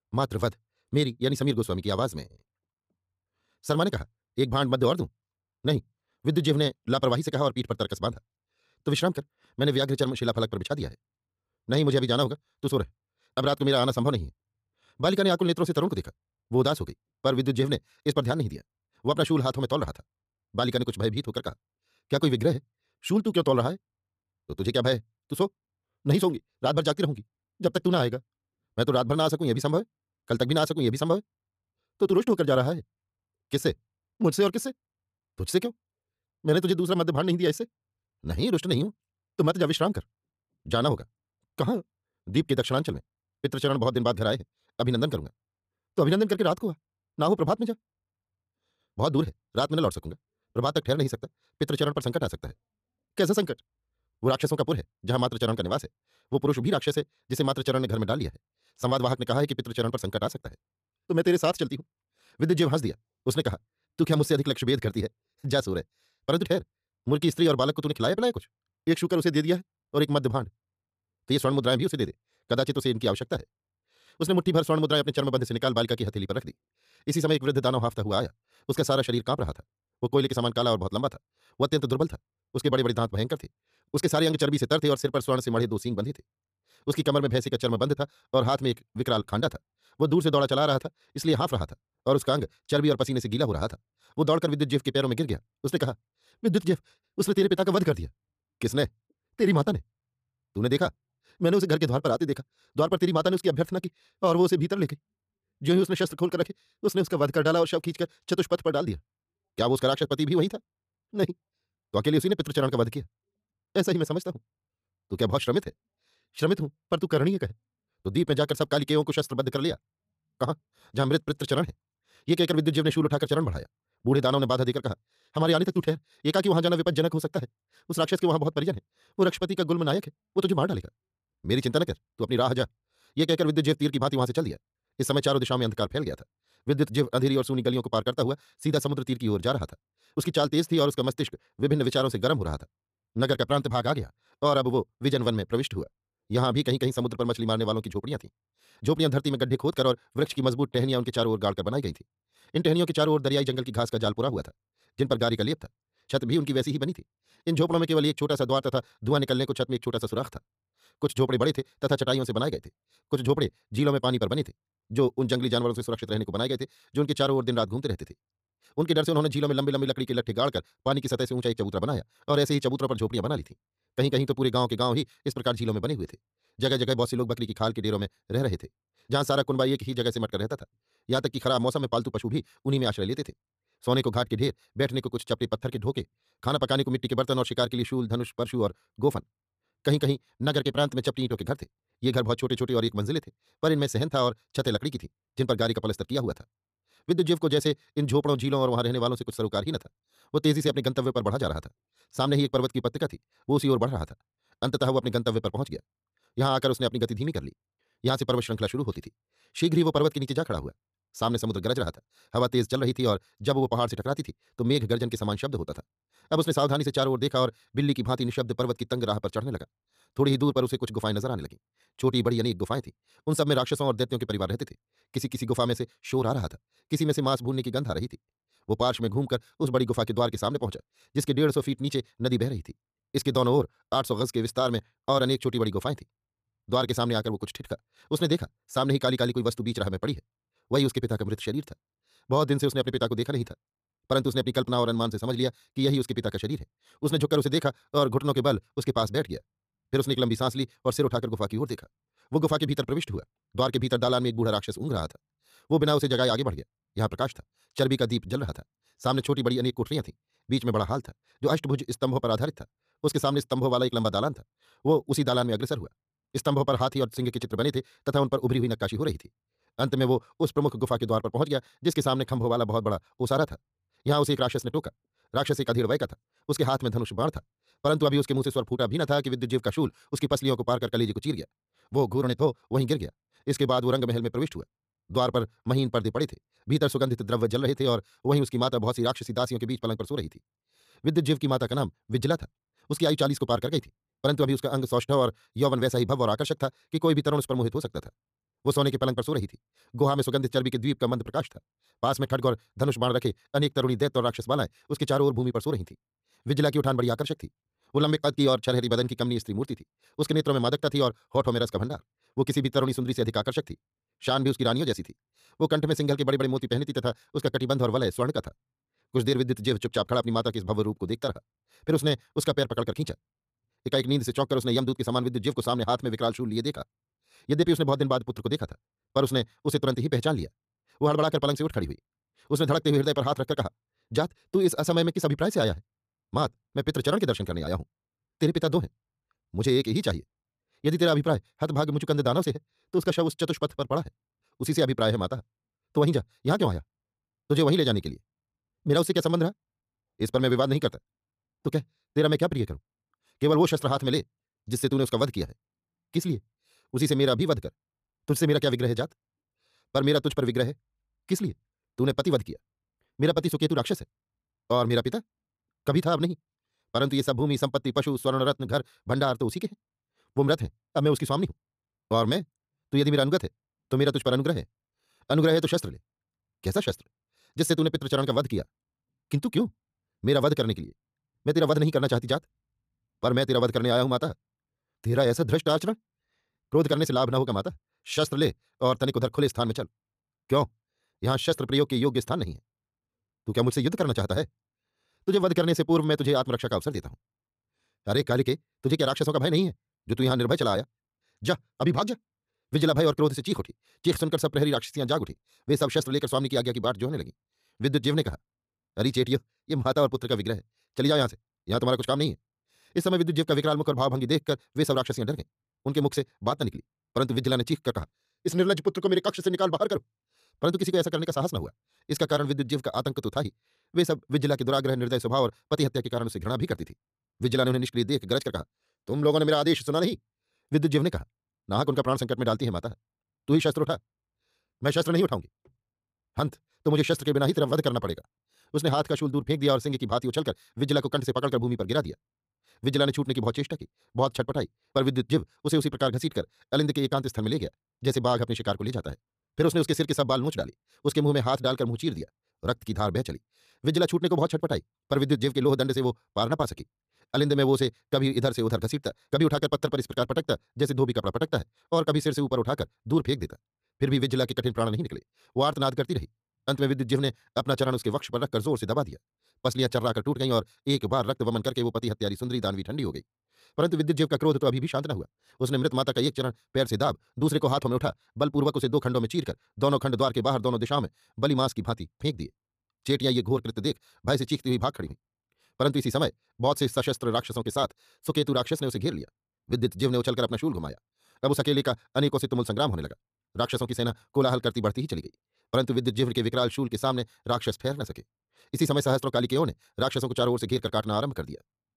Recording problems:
wrong speed, natural pitch; too fast; 1.7 times normal speed

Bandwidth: 14.5 kHz